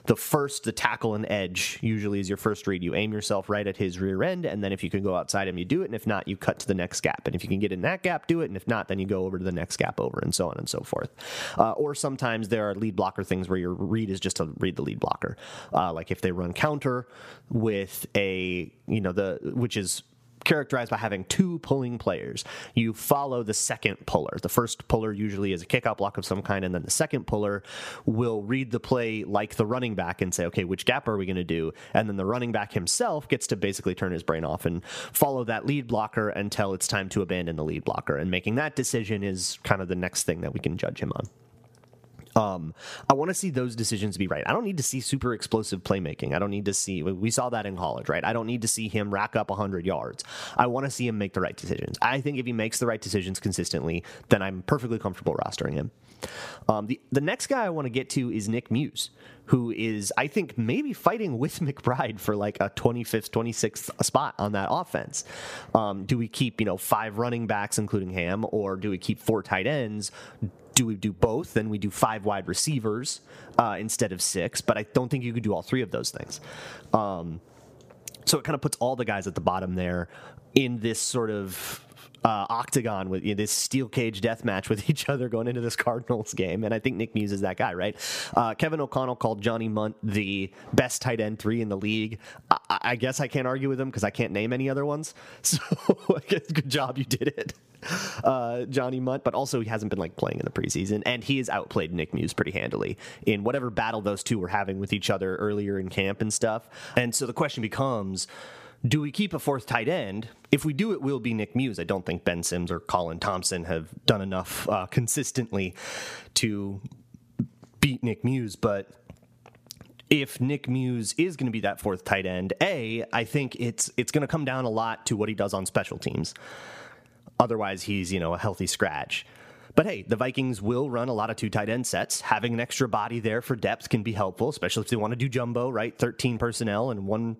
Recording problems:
squashed, flat; somewhat

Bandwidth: 15 kHz